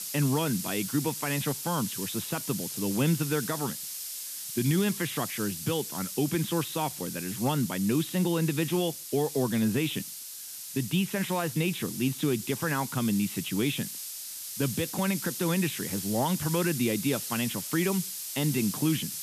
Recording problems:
high frequencies cut off; severe; nothing above 4 kHz
hiss; loud; throughout; 6 dB below the speech

